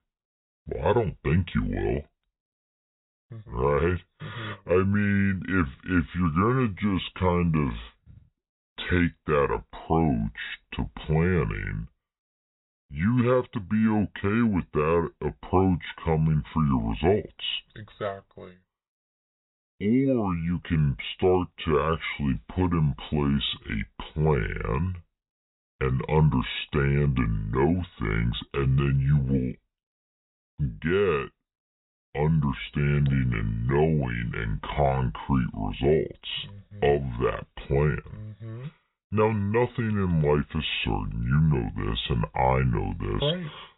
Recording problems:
high frequencies cut off; severe; nothing above 4 kHz
wrong speed and pitch; too slow and too low; 0.7 times normal speed

